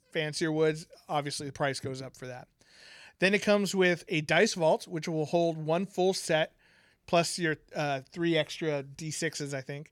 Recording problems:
none

